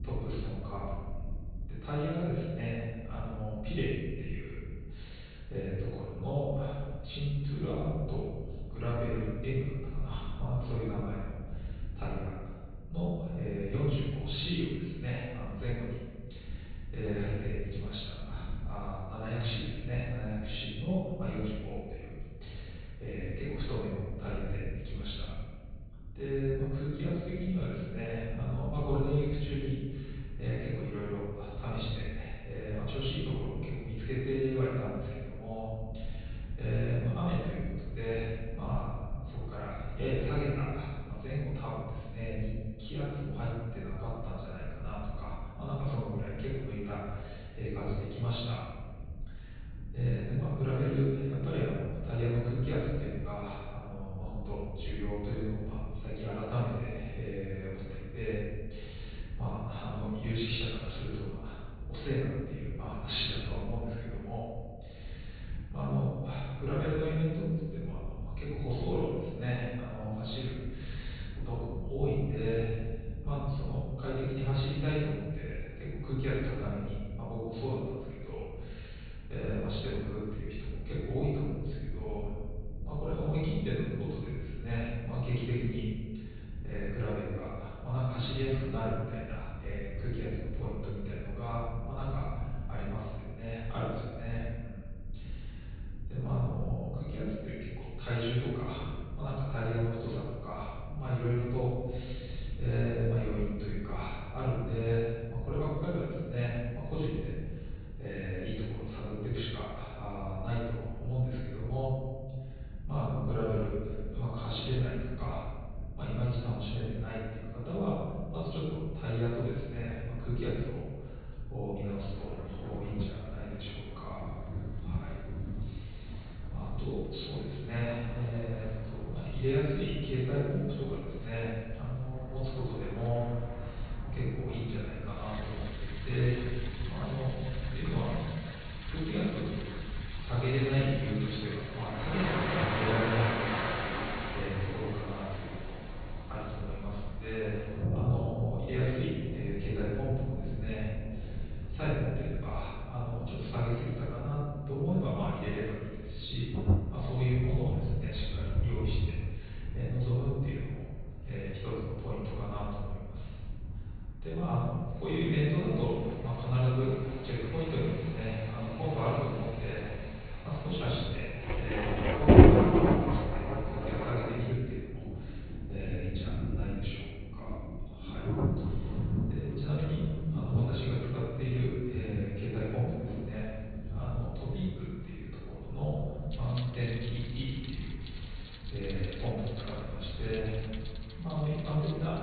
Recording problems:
room echo; strong; dies away in 1.5 s
off-mic speech; far
high frequencies cut off; severe; nothing above 4.5 kHz
rain or running water; very loud; from 2:02 on; 3 dB above the speech
low rumble; noticeable; throughout; 20 dB below the speech

